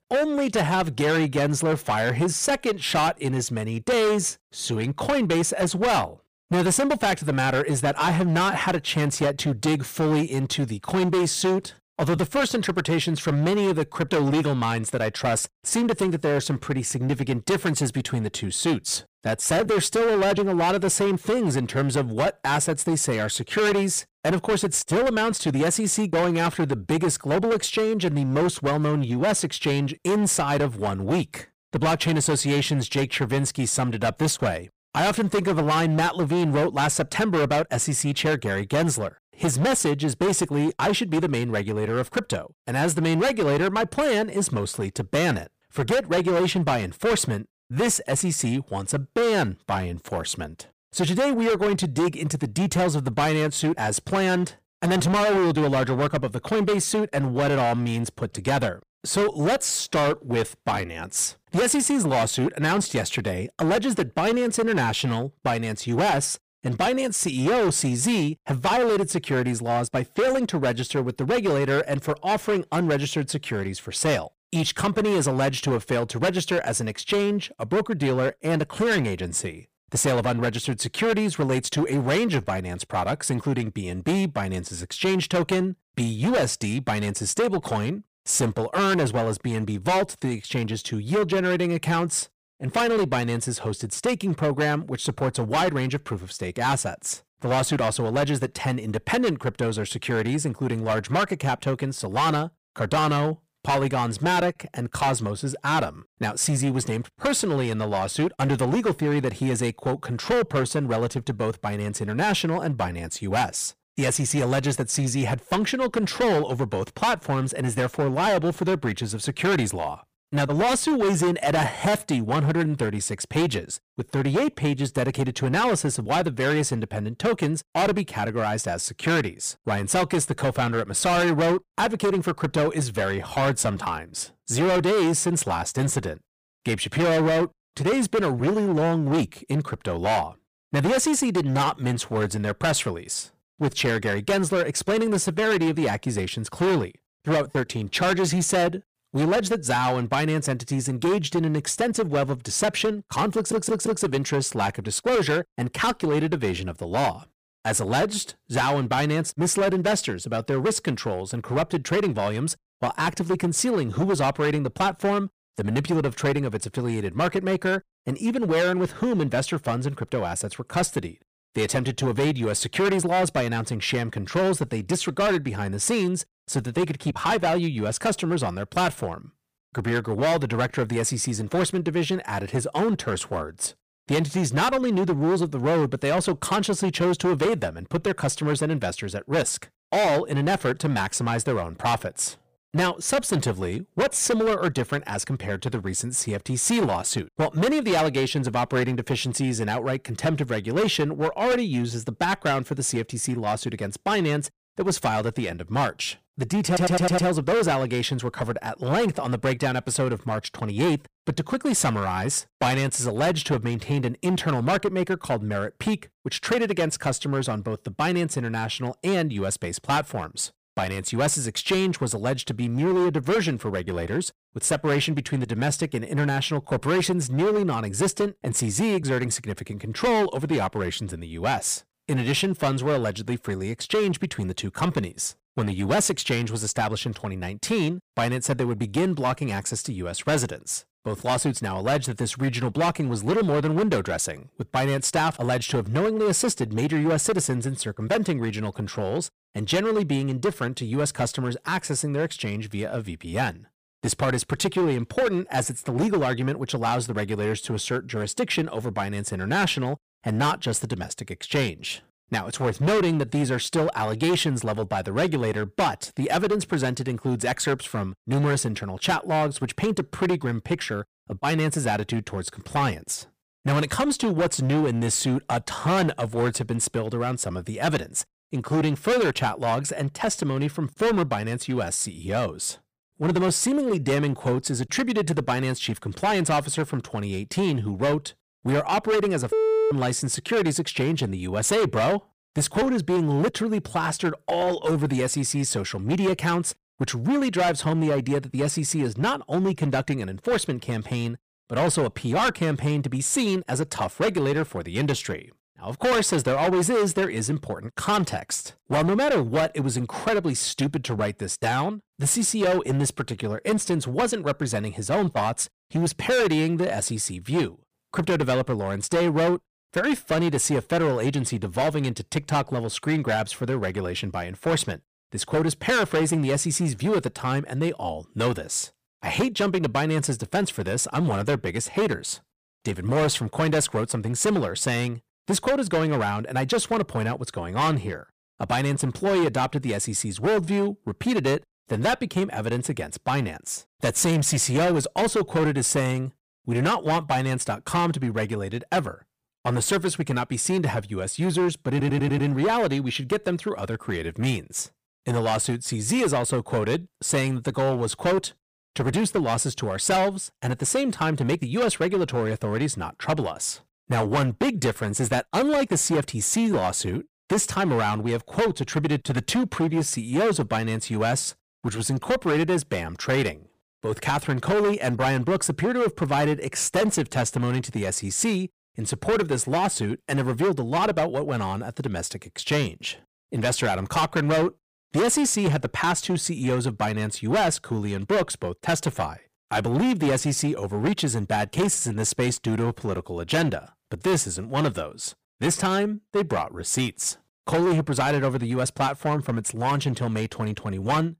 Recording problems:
distortion; heavy; 14% of the sound clipped
audio stuttering; at 2:33, at 3:27 and at 5:52

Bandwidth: 15 kHz